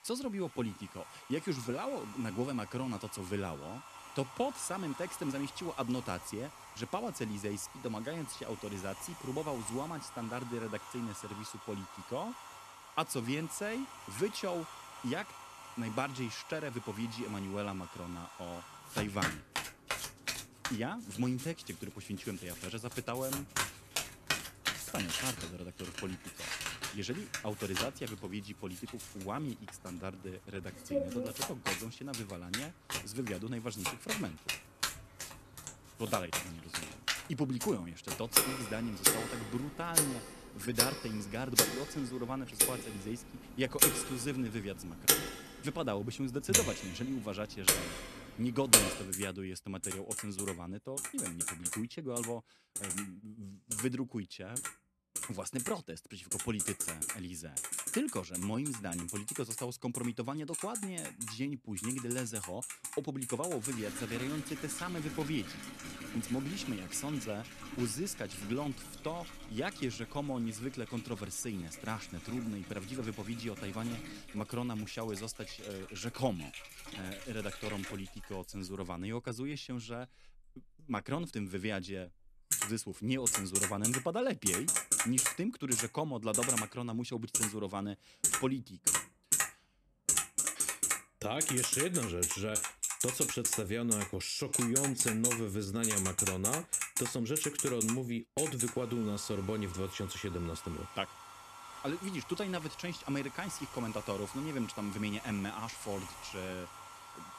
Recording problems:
household noises; very loud; throughout; 4 dB above the speech

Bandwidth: 13.5 kHz